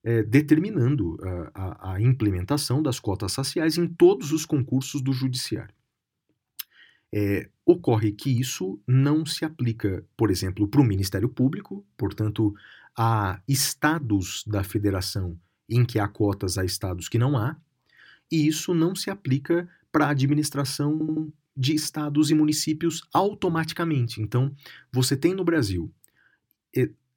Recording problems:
audio stuttering; at 21 s

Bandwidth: 17 kHz